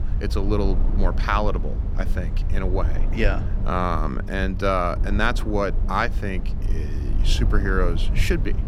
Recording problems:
low rumble; noticeable; throughout; 15 dB below the speech

